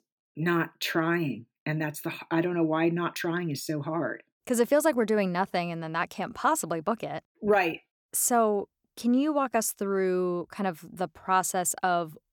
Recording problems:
none

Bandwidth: 18 kHz